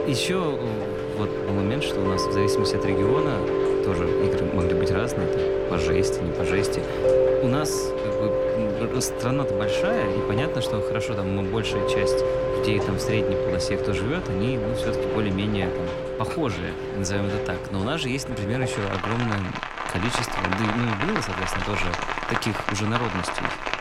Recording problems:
rain or running water; very loud; throughout; 2 dB above the speech

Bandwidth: 16.5 kHz